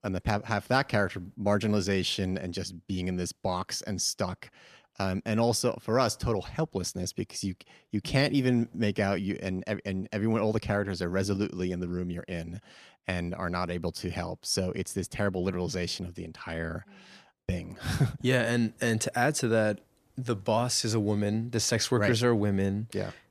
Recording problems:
none

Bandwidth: 14.5 kHz